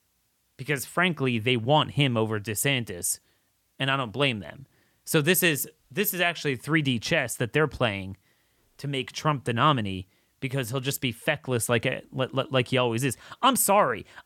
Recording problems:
none

